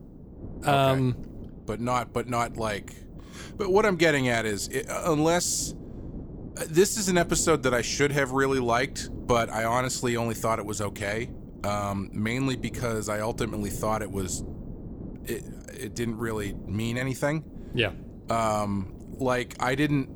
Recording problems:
wind noise on the microphone; occasional gusts; 20 dB below the speech

